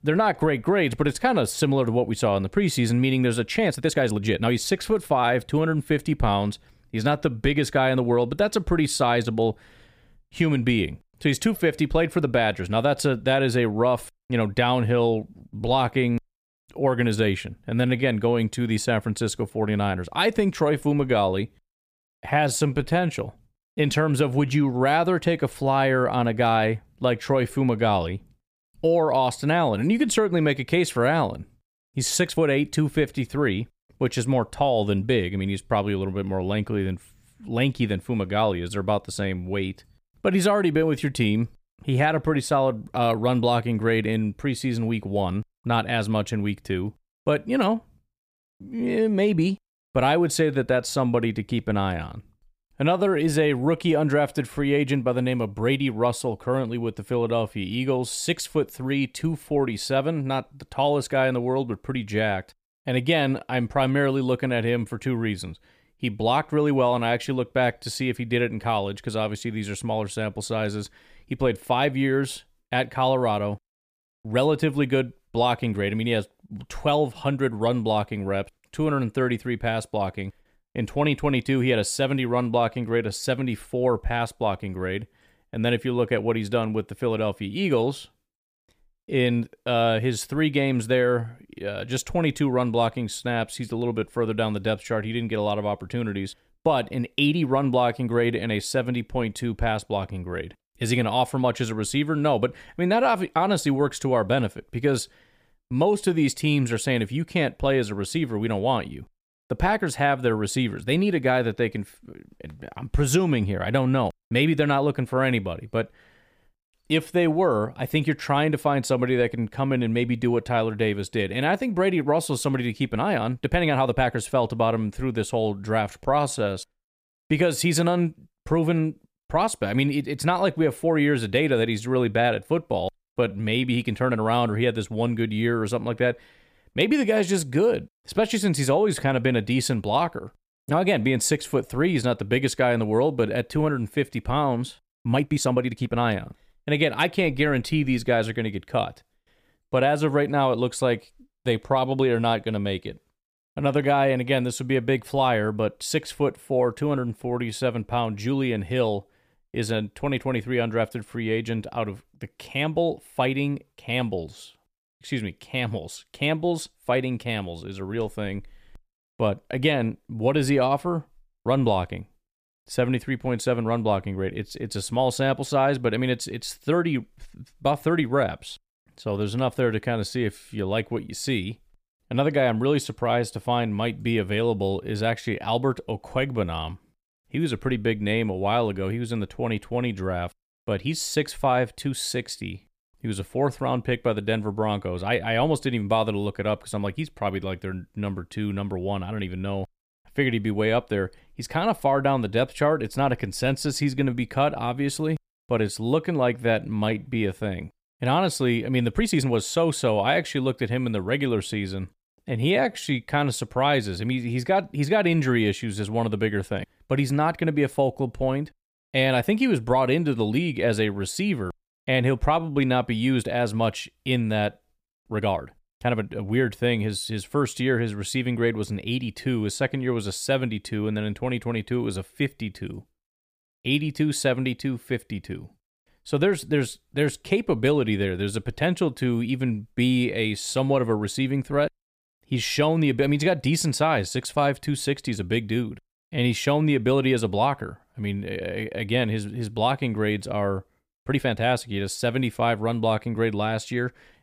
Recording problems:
uneven, jittery; strongly; from 3.5 s to 4:11

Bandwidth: 15 kHz